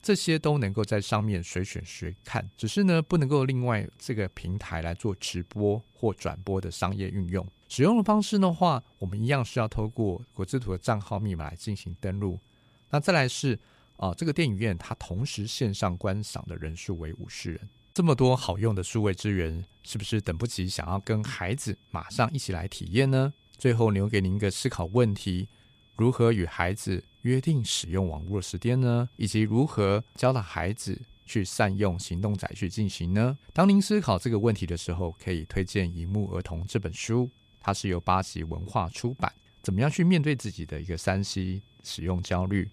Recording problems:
high-pitched whine; faint; throughout; 3.5 kHz, 35 dB below the speech

